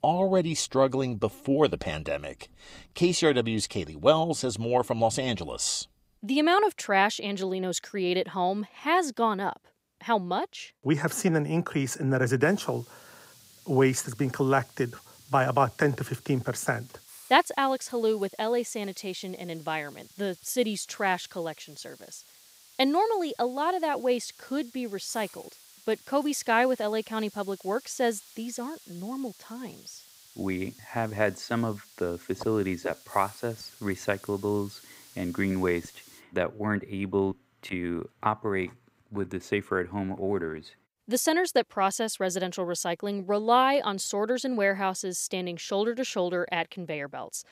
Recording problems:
hiss; faint; from 12 to 36 s; 25 dB below the speech

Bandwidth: 15.5 kHz